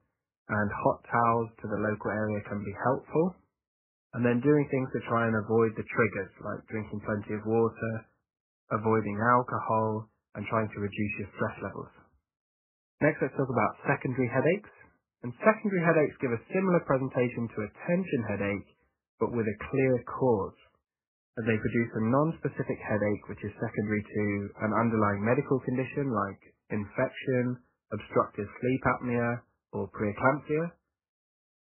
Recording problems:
garbled, watery; badly; nothing above 2.5 kHz

